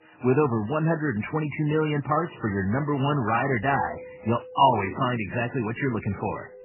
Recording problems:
garbled, watery; badly; nothing above 3 kHz
background music; noticeable; throughout; 20 dB below the speech

